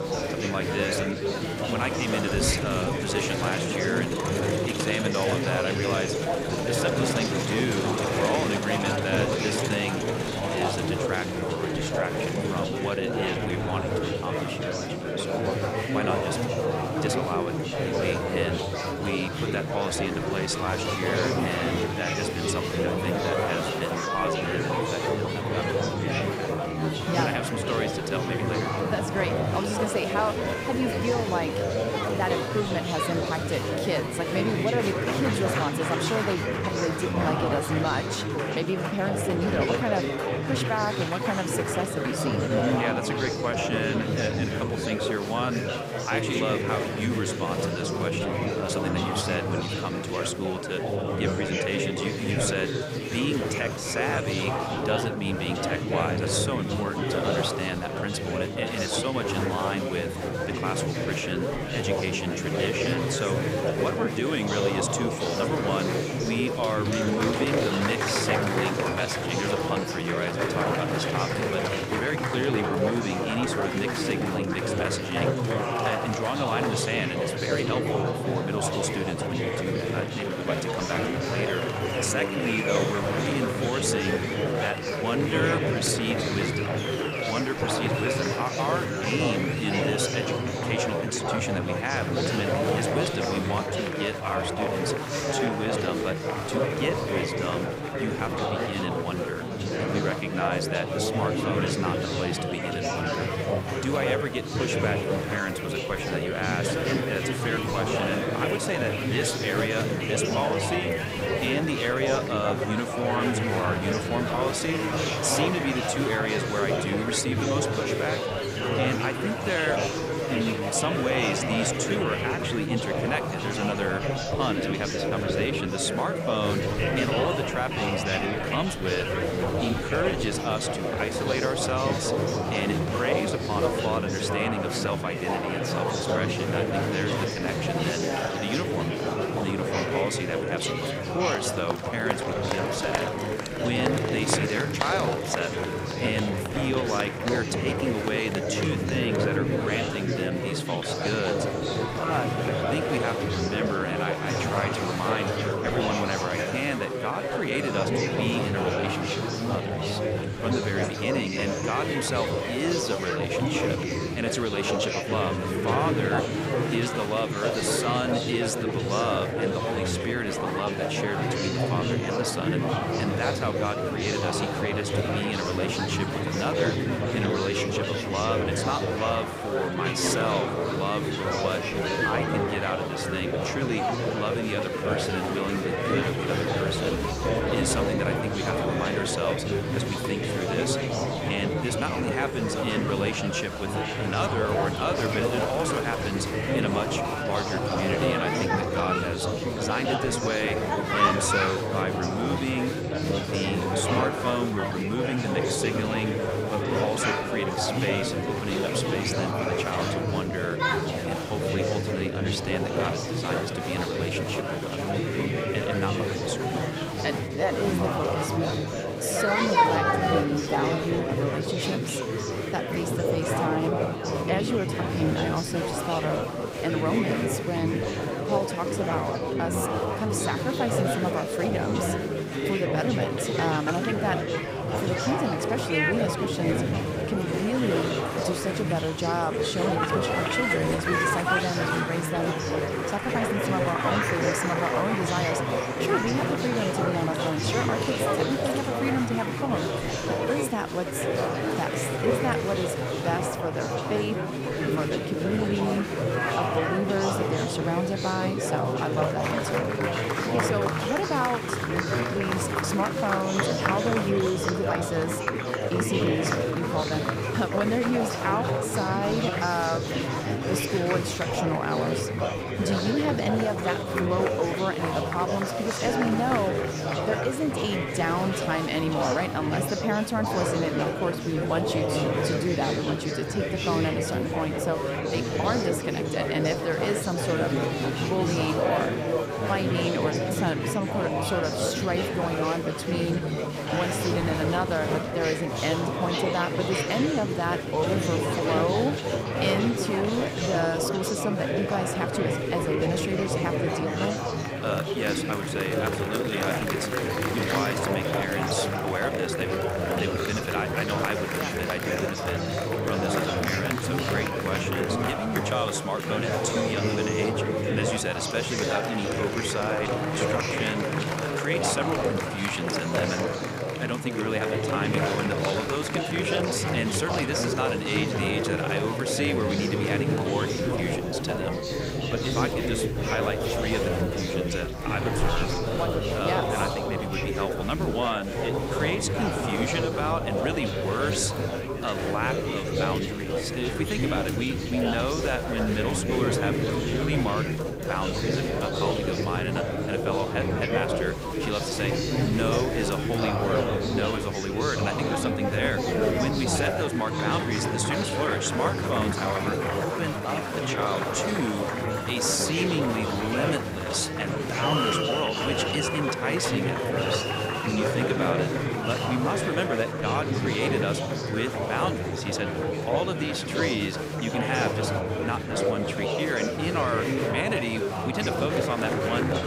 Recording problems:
chatter from many people; very loud; throughout; 3 dB above the speech

